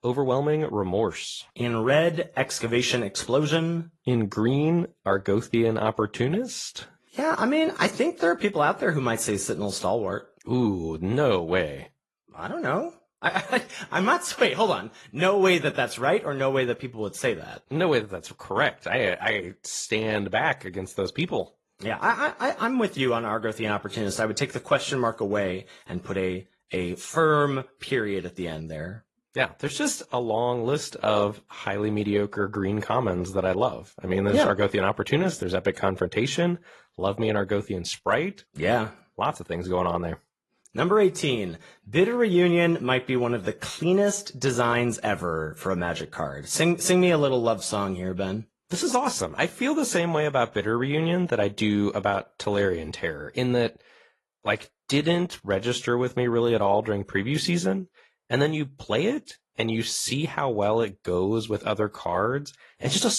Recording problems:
garbled, watery; slightly; nothing above 11.5 kHz
abrupt cut into speech; at the end

